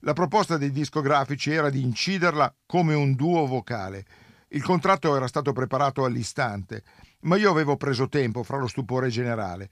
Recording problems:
none

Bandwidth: 15 kHz